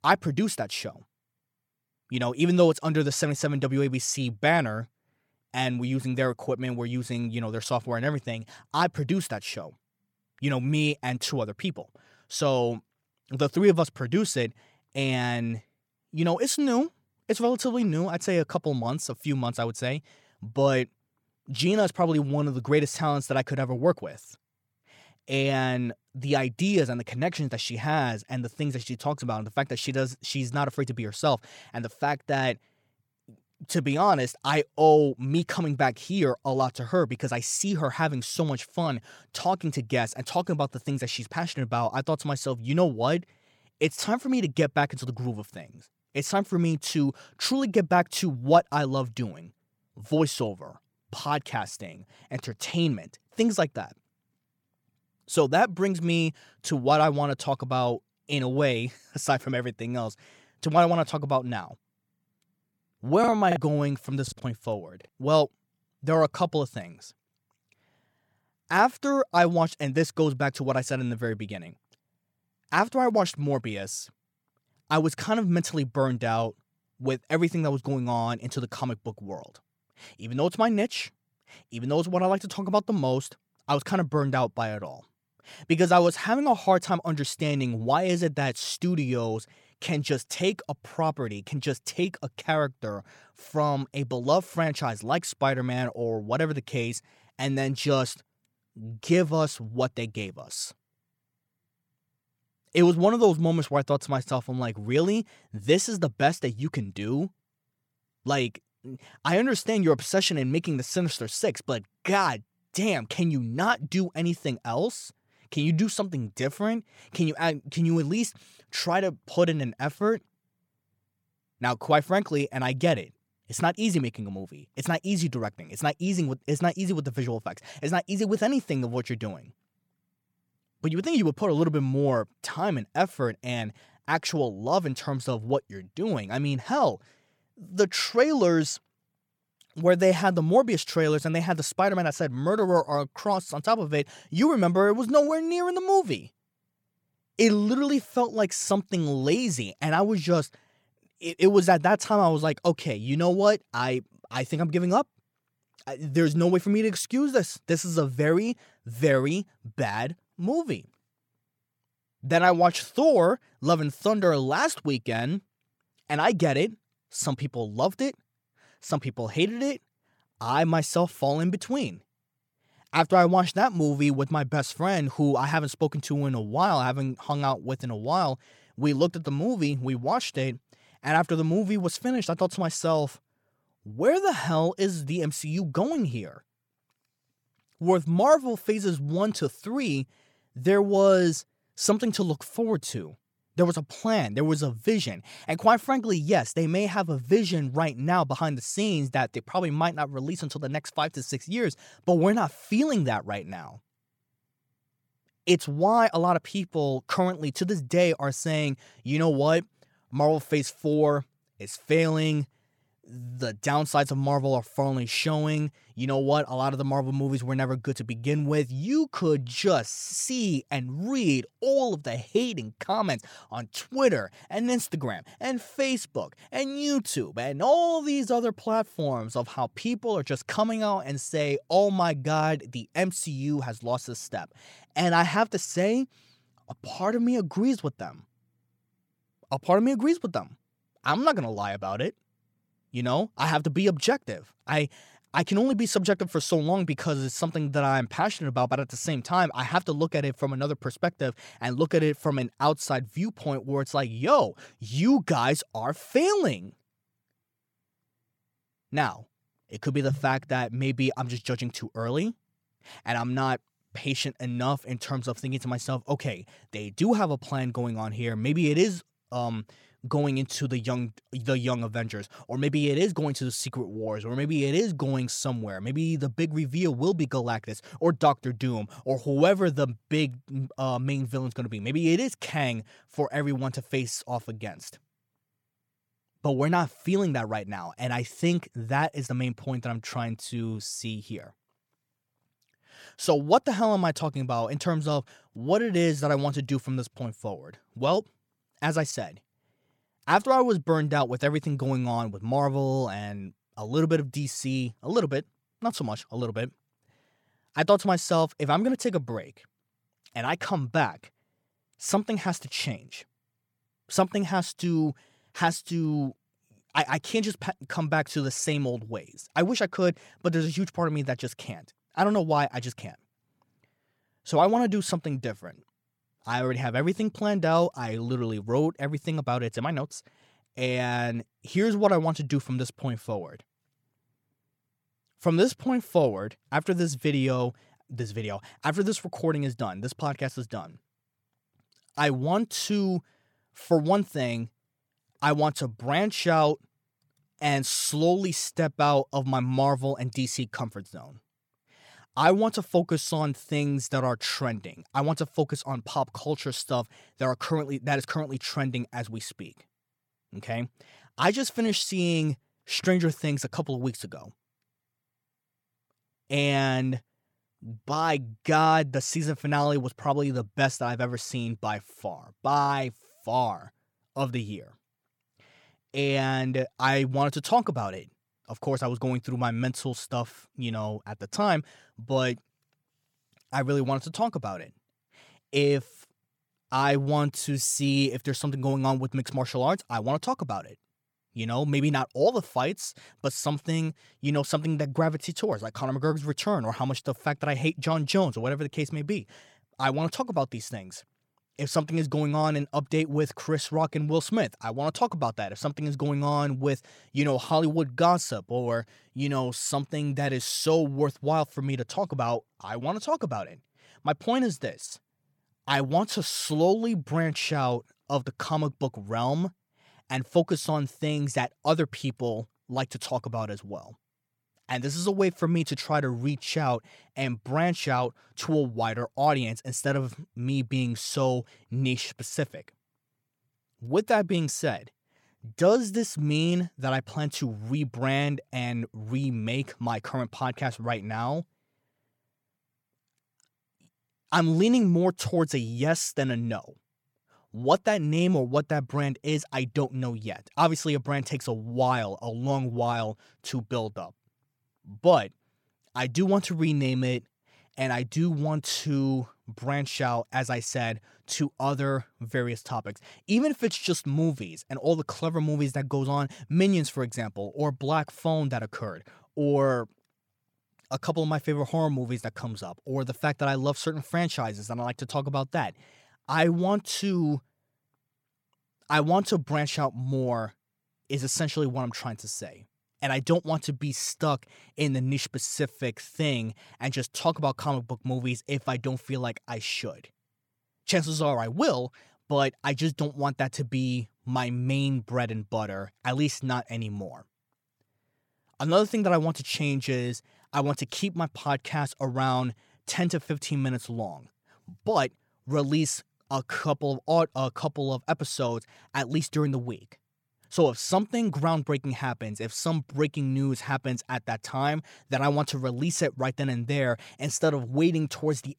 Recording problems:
choppy; very; from 1:03 to 1:04; 8% of the speech affected

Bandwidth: 17 kHz